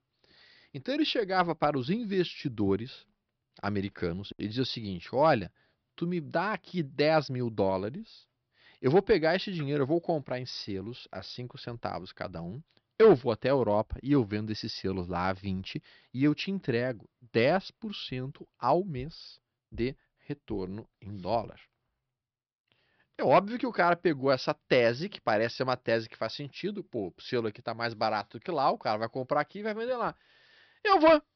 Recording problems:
high frequencies cut off; noticeable; nothing above 5.5 kHz

